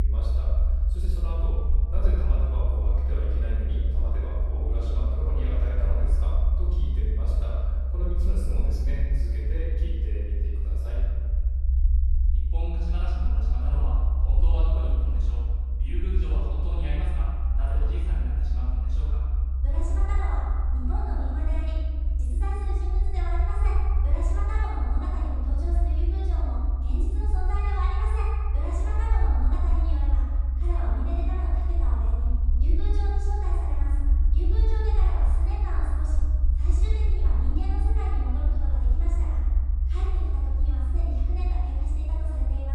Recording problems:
room echo; strong; dies away in 1.6 s
off-mic speech; far
low rumble; loud; throughout; 7 dB below the speech
abrupt cut into speech; at the start and the end

